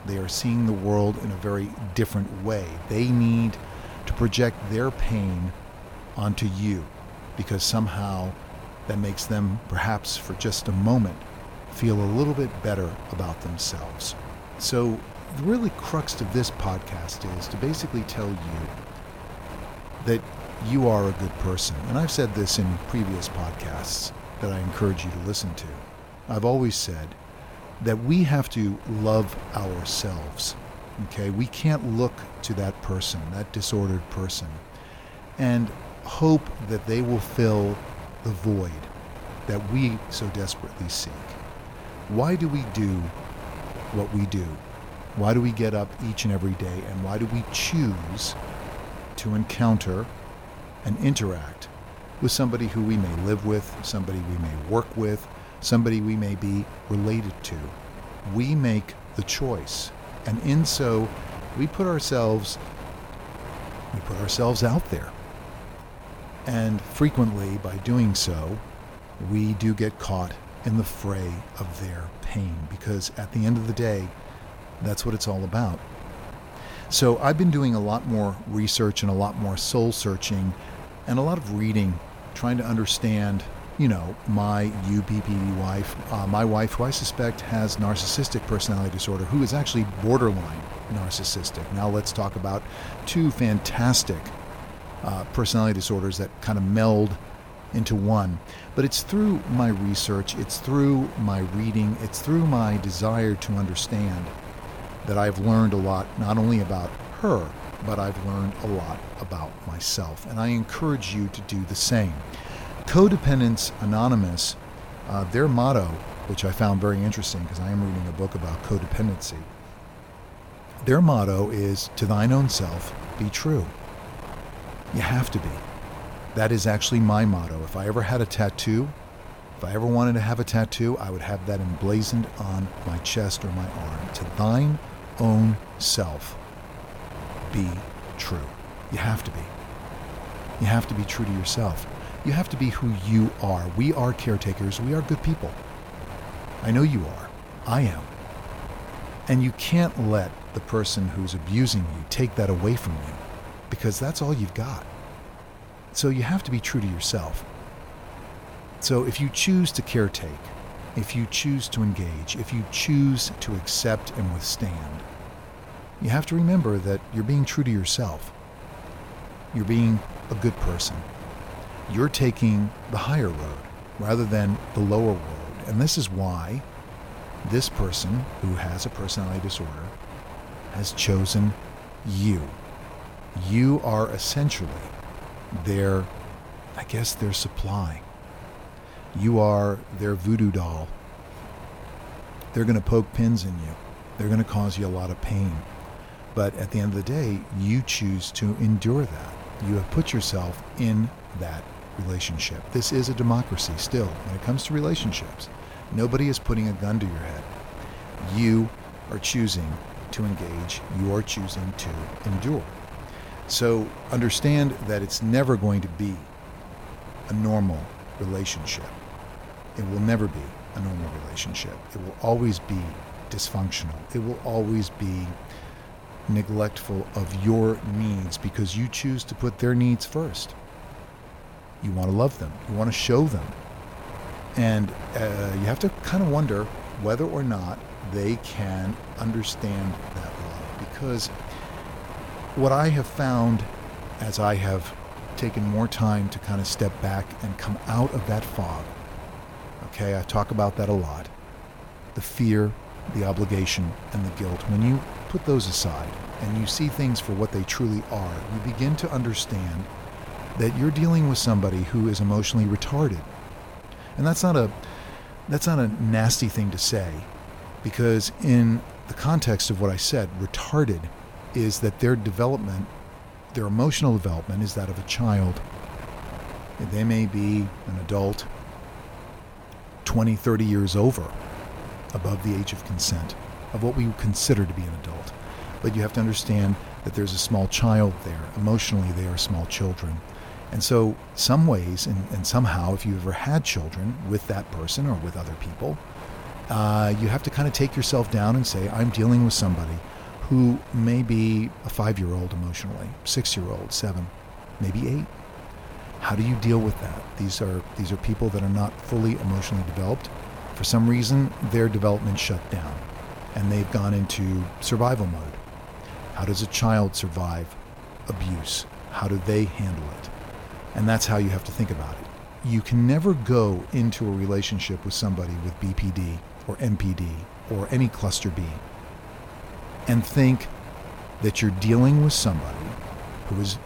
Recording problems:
wind noise on the microphone; occasional gusts; 10 dB below the speech

